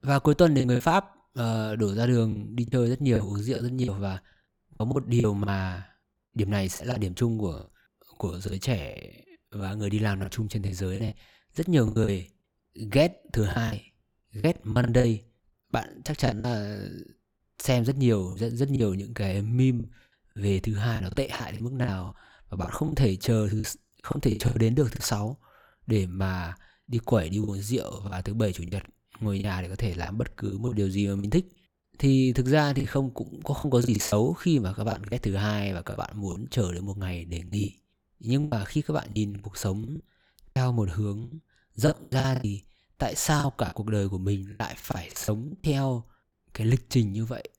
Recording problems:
choppy; very; 11% of the speech affected

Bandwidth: 19 kHz